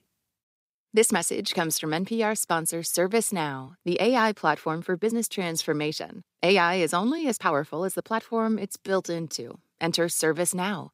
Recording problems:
uneven, jittery; strongly; from 1 to 10 s

